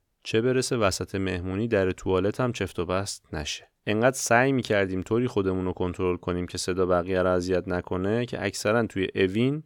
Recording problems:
none

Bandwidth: 18.5 kHz